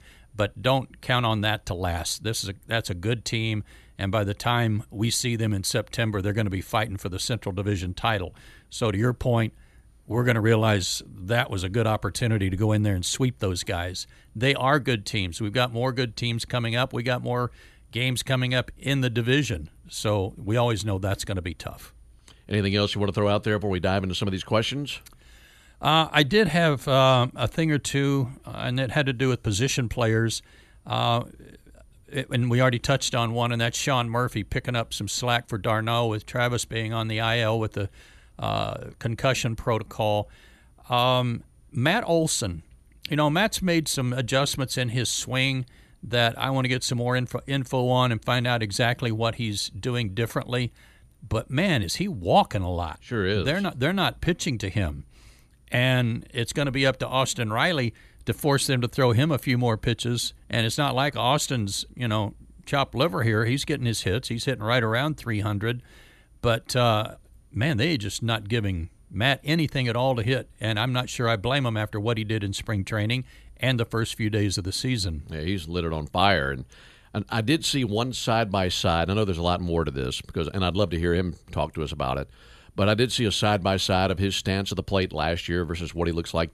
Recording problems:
none

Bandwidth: 13.5 kHz